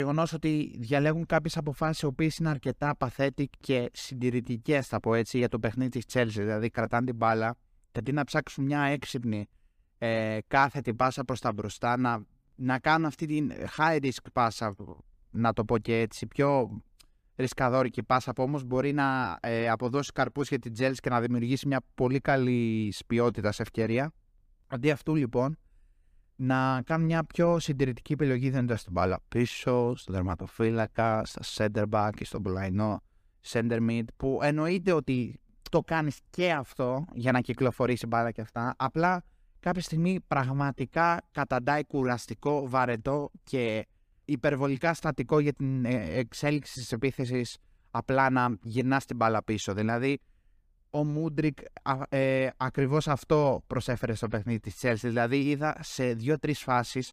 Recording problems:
abrupt cut into speech; at the start

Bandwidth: 15 kHz